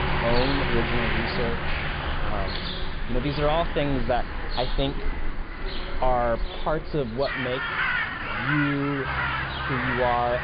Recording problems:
high frequencies cut off; severe; nothing above 5 kHz
animal sounds; loud; throughout; 3 dB below the speech
traffic noise; loud; throughout; 3 dB below the speech
voice in the background; noticeable; throughout; 20 dB below the speech
wind noise on the microphone; occasional gusts; 25 dB below the speech

